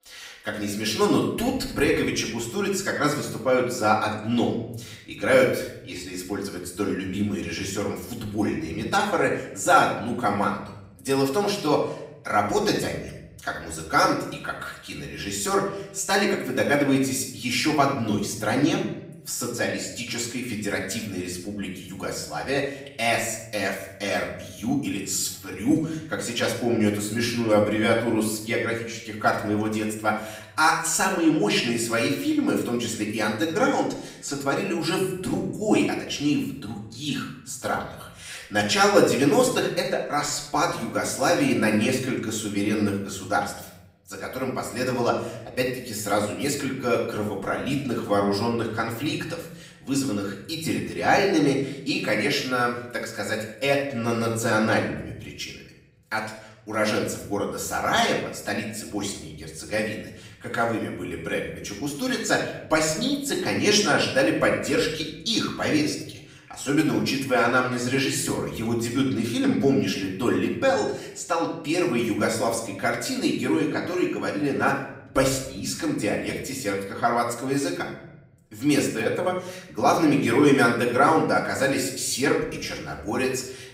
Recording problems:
off-mic speech; far
room echo; noticeable; dies away in 0.8 s

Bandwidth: 15.5 kHz